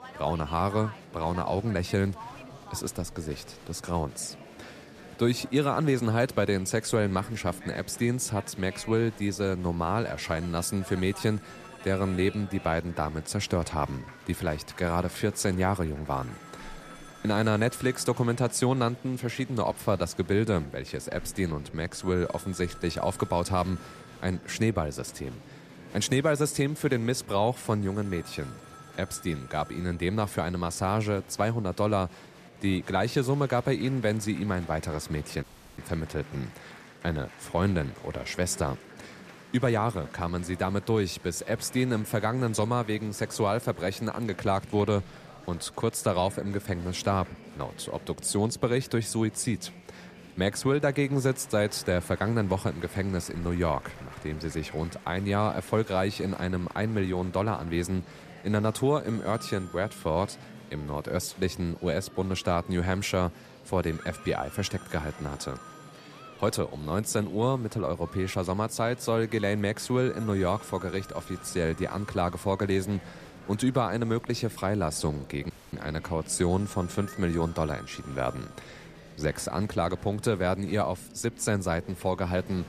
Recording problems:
murmuring crowd; noticeable; throughout; 20 dB below the speech
alarms or sirens; faint; throughout; 25 dB below the speech
audio cutting out; at 35 s and at 1:16

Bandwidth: 14.5 kHz